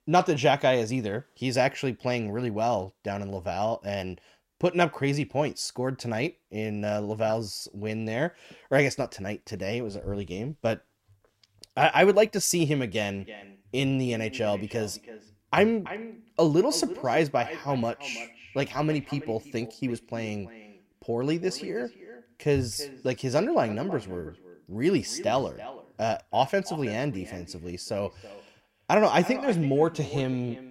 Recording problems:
echo of what is said; noticeable; from 13 s on; 330 ms later, 15 dB below the speech

